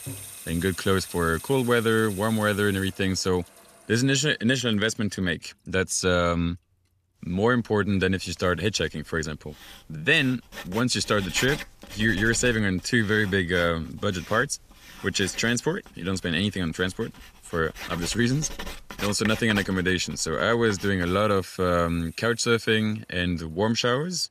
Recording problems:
household noises; noticeable; throughout; 15 dB below the speech

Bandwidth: 14.5 kHz